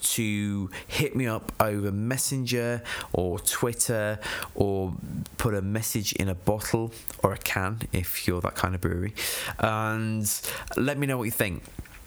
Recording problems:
squashed, flat; heavily

